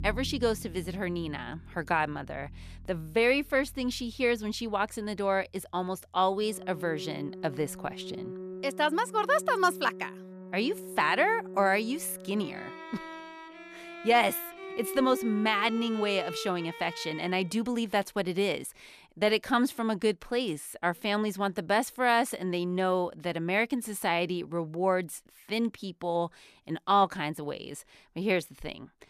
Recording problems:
background music; noticeable; until 17 s; 15 dB below the speech

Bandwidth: 14.5 kHz